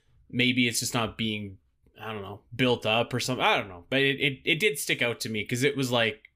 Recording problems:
none

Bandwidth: 15 kHz